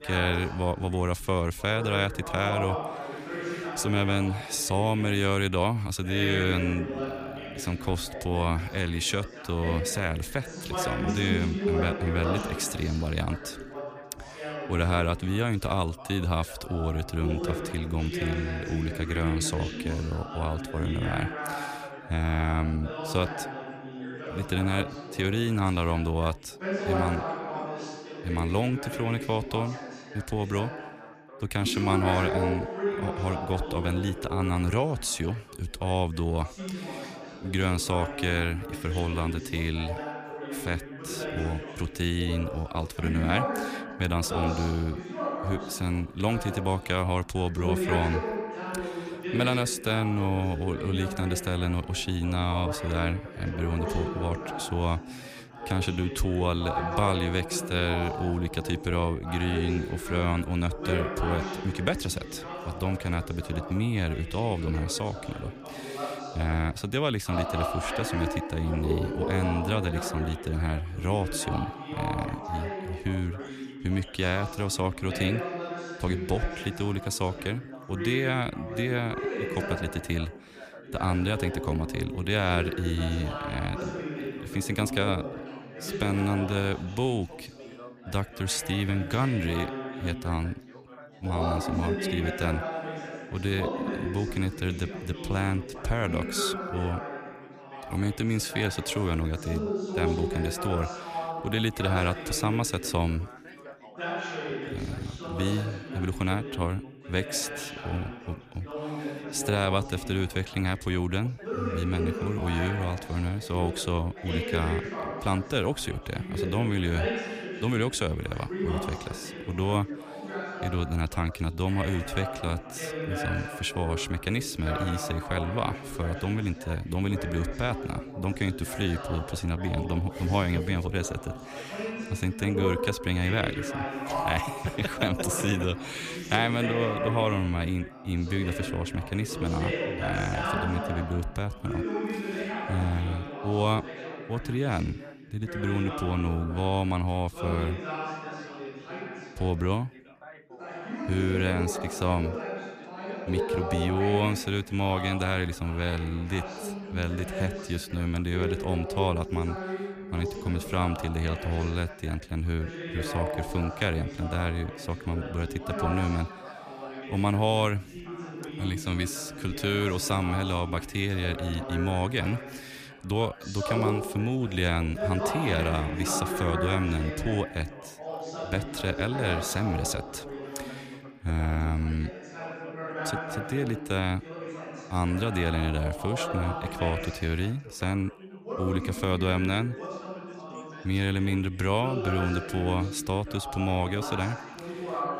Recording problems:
background chatter; loud; throughout; 3 voices, 6 dB below the speech

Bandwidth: 15 kHz